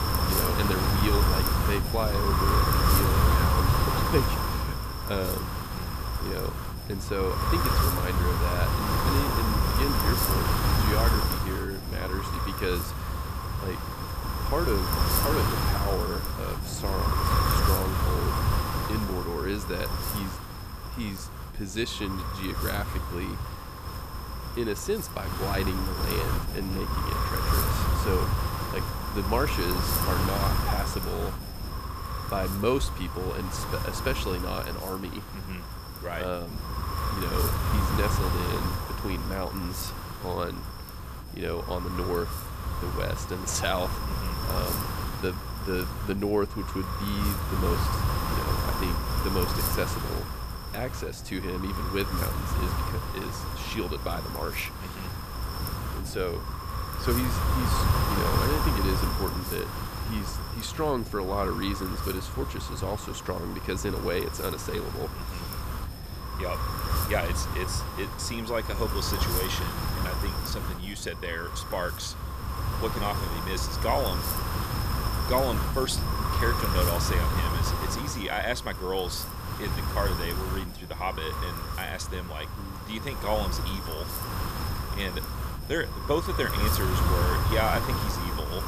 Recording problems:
wind noise on the microphone; heavy; 1 dB above the speech

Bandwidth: 14.5 kHz